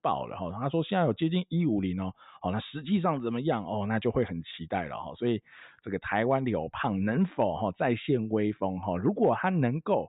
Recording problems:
high frequencies cut off; severe; nothing above 4 kHz

